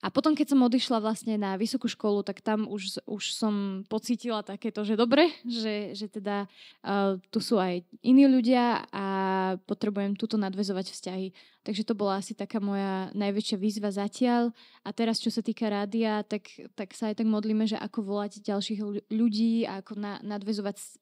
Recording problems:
none

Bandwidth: 15.5 kHz